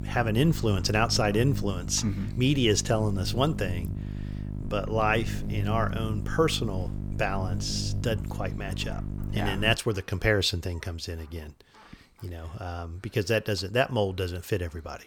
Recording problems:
electrical hum; noticeable; until 10 s; 50 Hz, 15 dB below the speech

